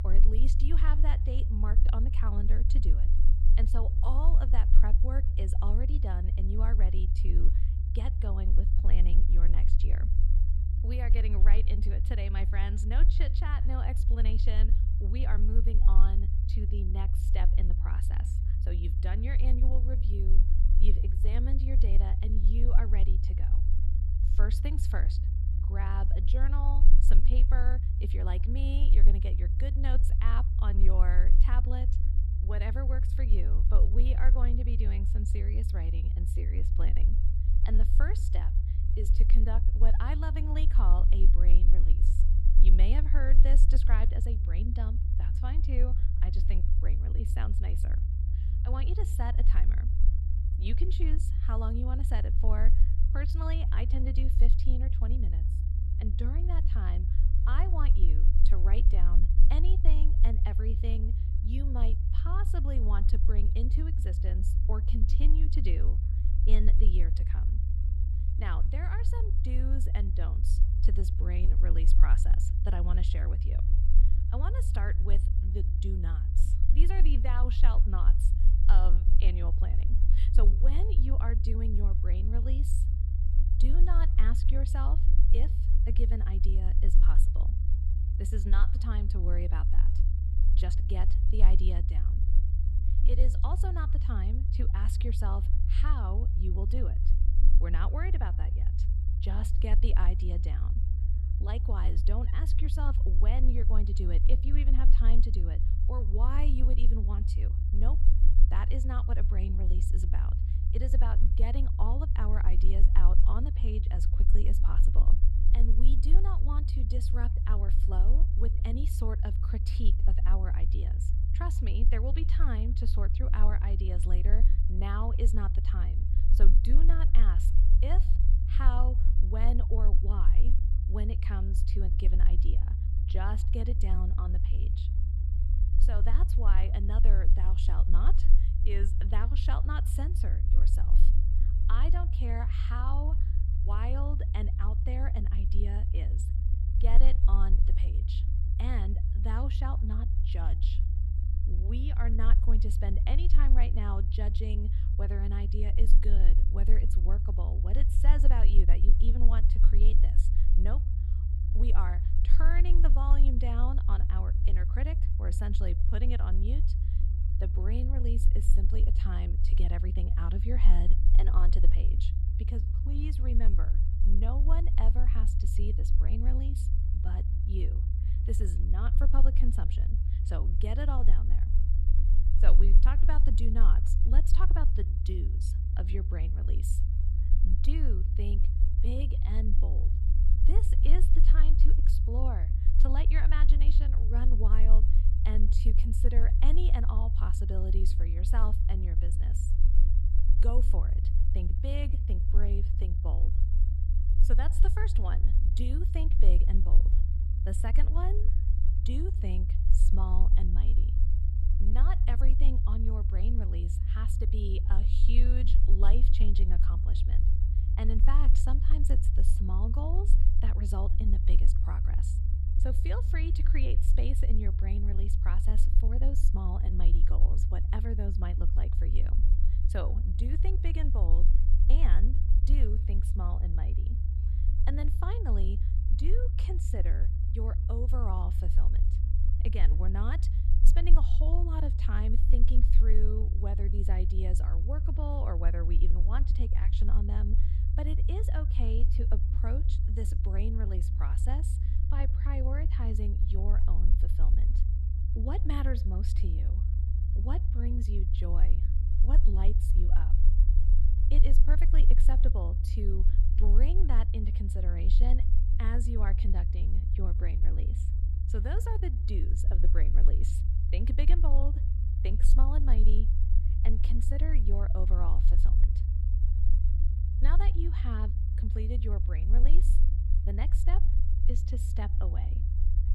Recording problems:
low rumble; loud; throughout; 5 dB below the speech

